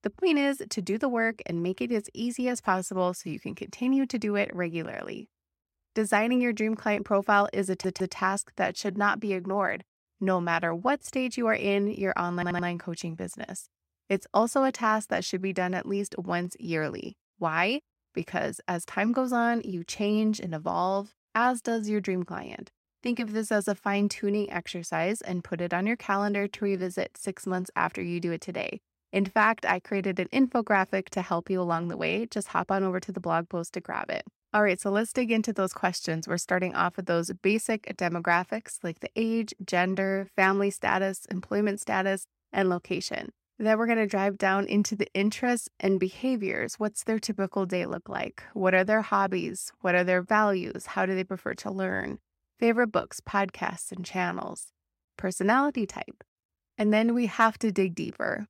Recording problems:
audio stuttering; at 7.5 s and at 12 s

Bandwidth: 16 kHz